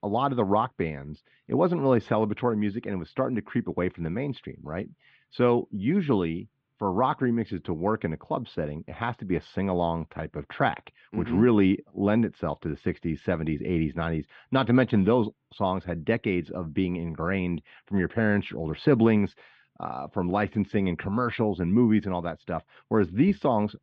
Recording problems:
muffled; very; fading above 3.5 kHz

